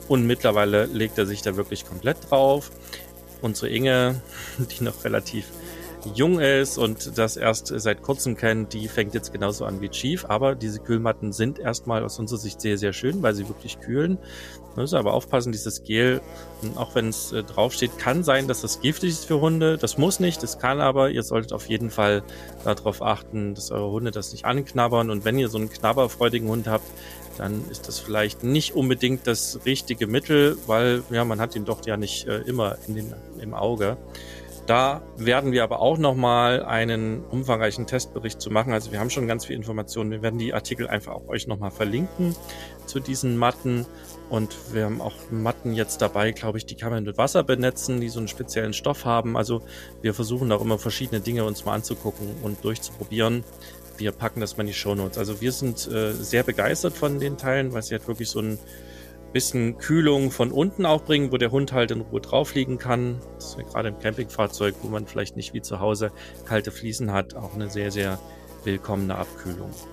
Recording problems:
electrical hum; noticeable; throughout; 60 Hz, 20 dB below the speech

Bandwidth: 14.5 kHz